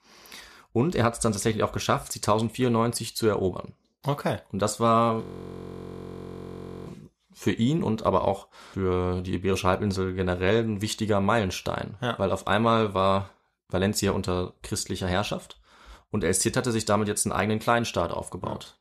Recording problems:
audio freezing; at 5 s for 1.5 s

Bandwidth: 14 kHz